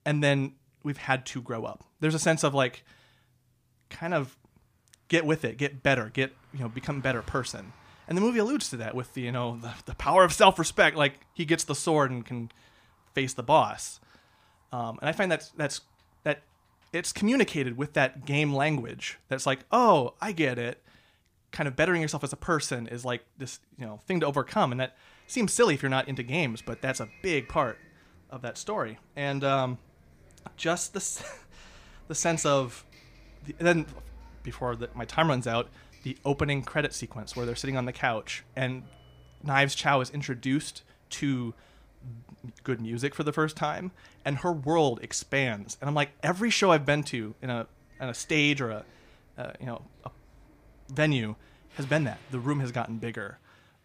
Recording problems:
traffic noise; faint; throughout; 25 dB below the speech

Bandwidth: 15 kHz